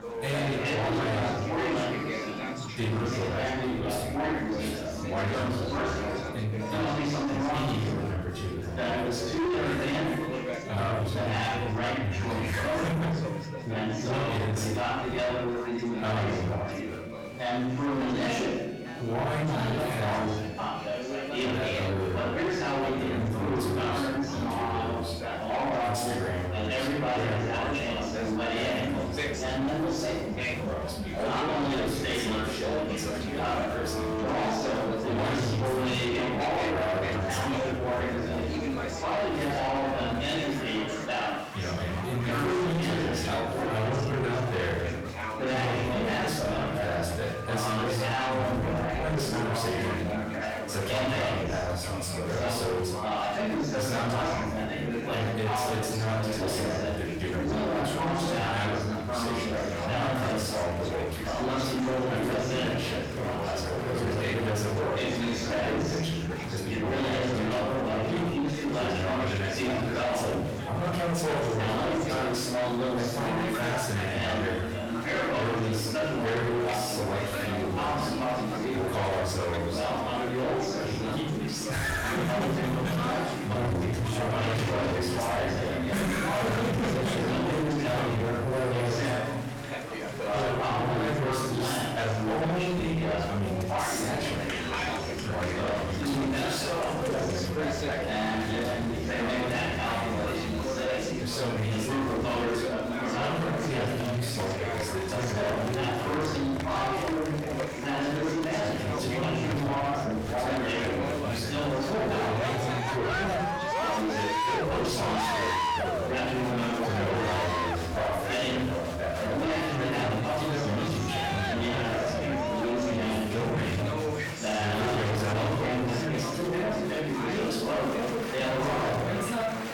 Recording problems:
distortion; heavy; 6 dB below the speech
off-mic speech; far
room echo; noticeable; dies away in 0.8 s
chatter from many people; very loud; throughout; 1 dB above the speech
background music; noticeable; until 1:26; 15 dB below the speech

